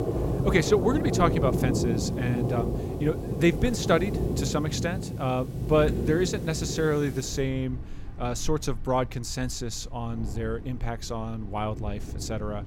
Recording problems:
rain or running water; loud; throughout; 3 dB below the speech

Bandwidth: 16.5 kHz